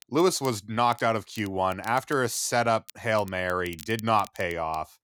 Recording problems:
crackle, like an old record; faint; 20 dB below the speech

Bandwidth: 19 kHz